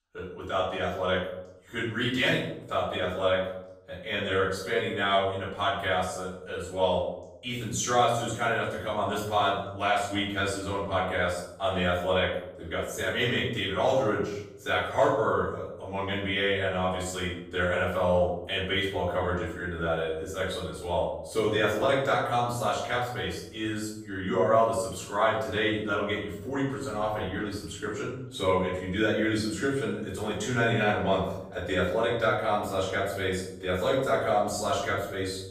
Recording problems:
off-mic speech; far
room echo; noticeable; dies away in 0.7 s

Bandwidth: 15 kHz